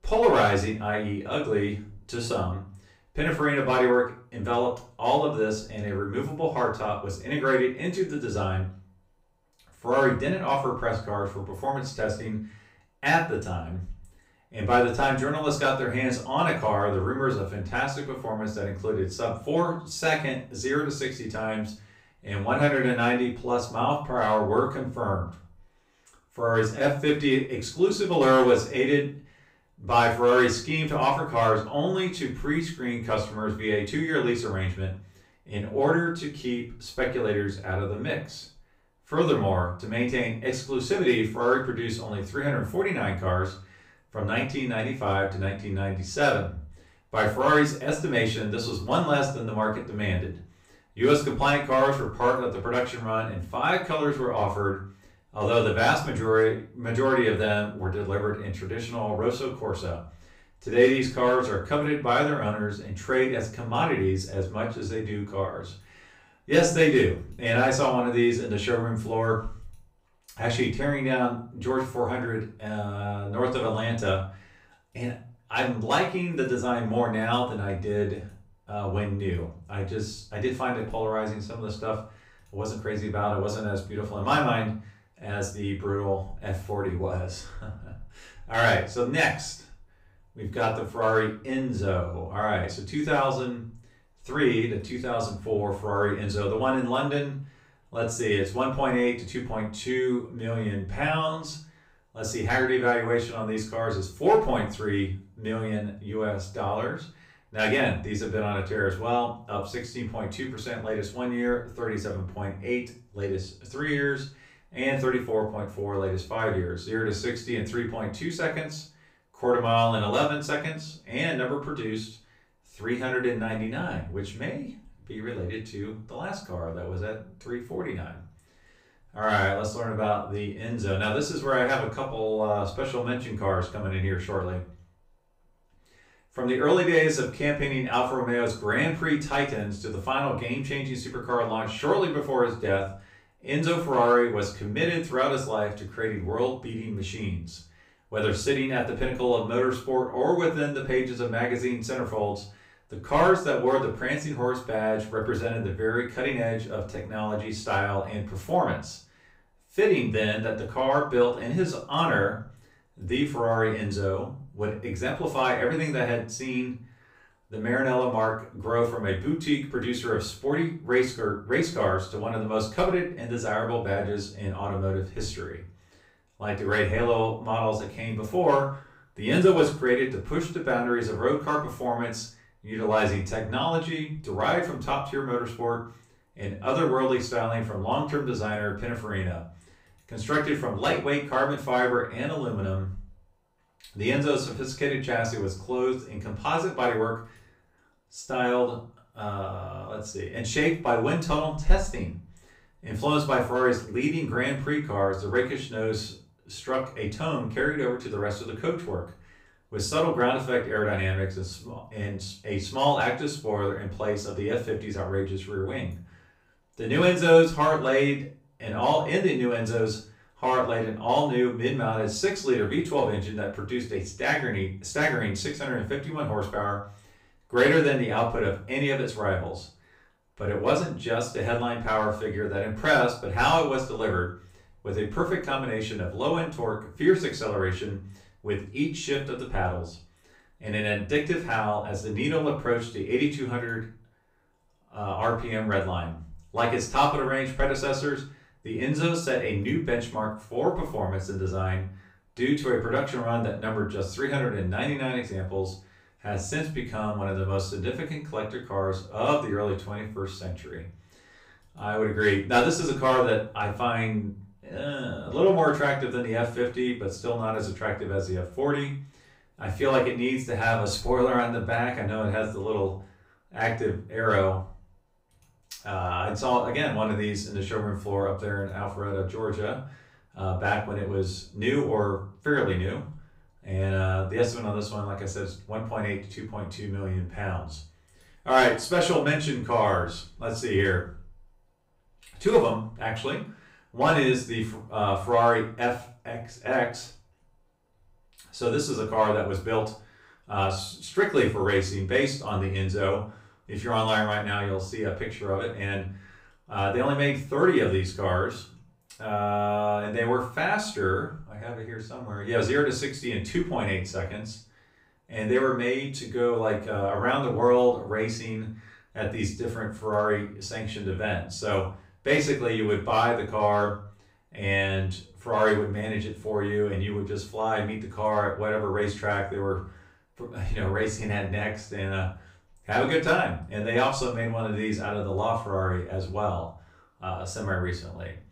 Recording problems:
off-mic speech; far
room echo; slight; dies away in 0.4 s

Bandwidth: 15.5 kHz